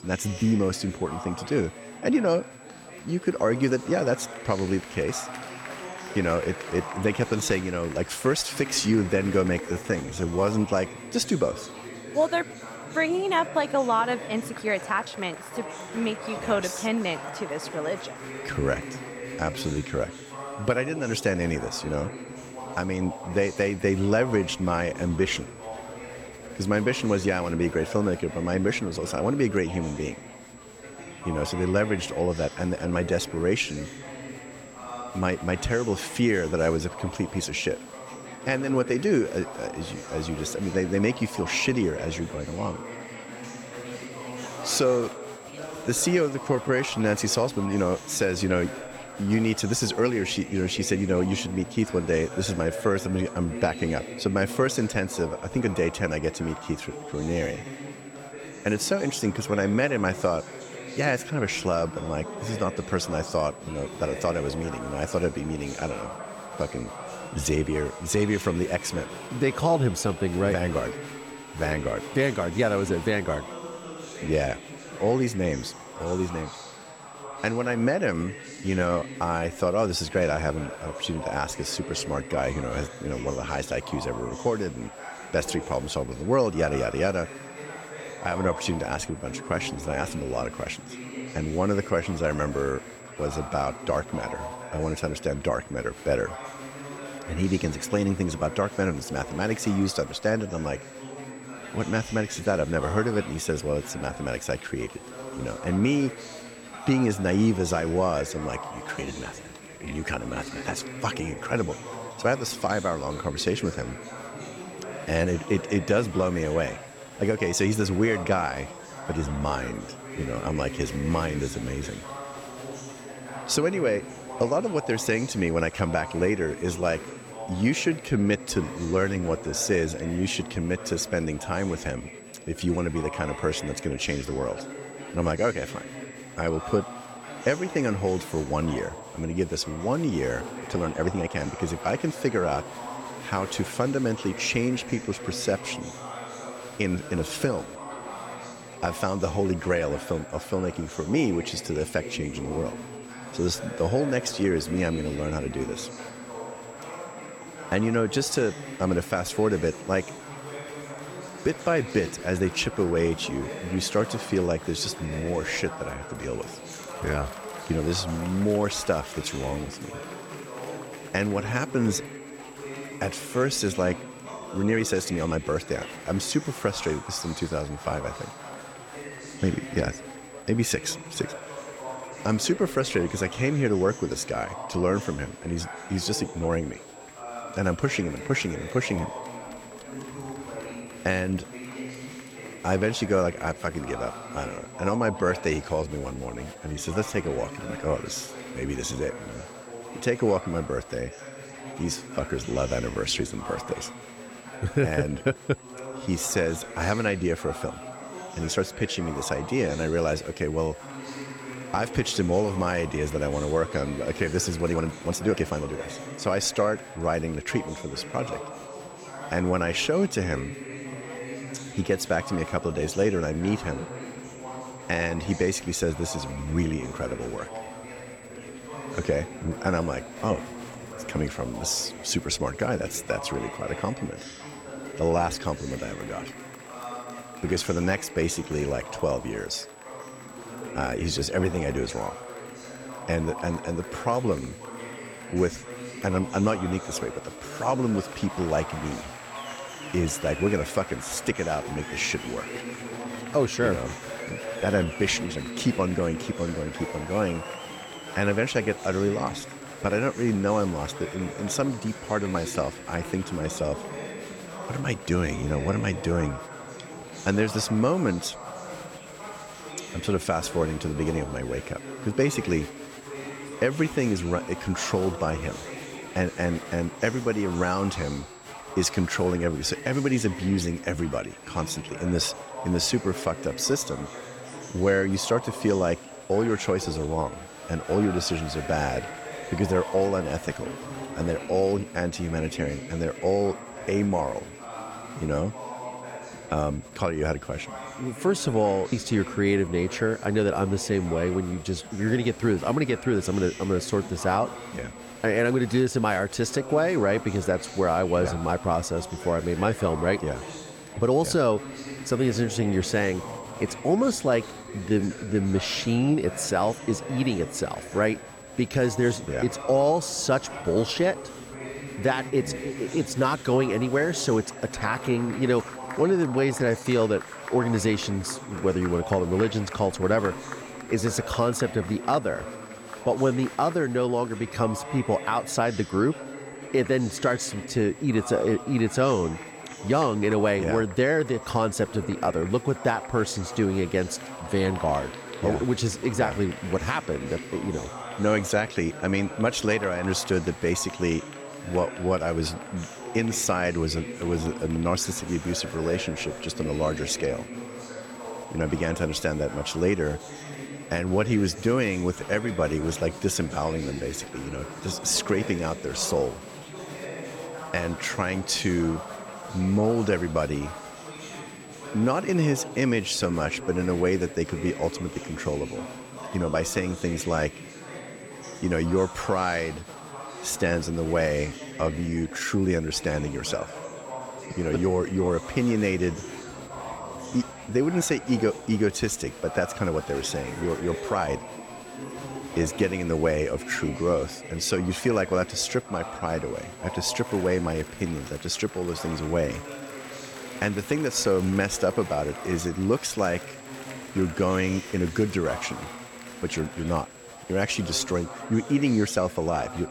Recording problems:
chatter from many people; noticeable; throughout; 10 dB below the speech
high-pitched whine; faint; throughout; 7.5 kHz, 25 dB below the speech
uneven, jittery; strongly; from 9.5 s to 6:31

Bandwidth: 17 kHz